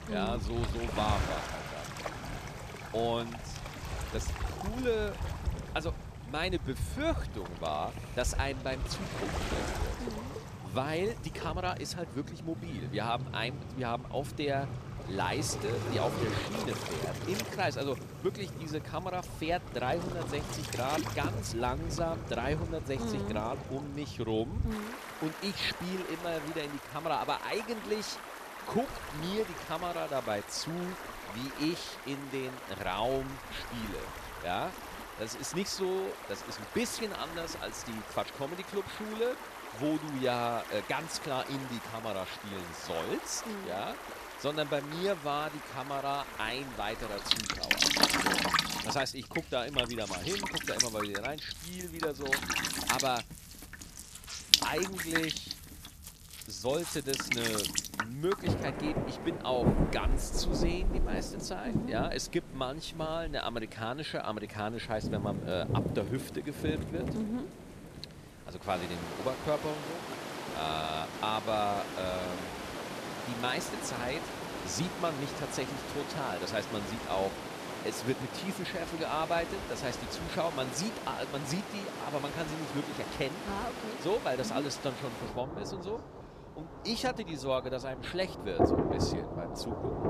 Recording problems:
rain or running water; loud; throughout; 1 dB below the speech

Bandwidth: 14.5 kHz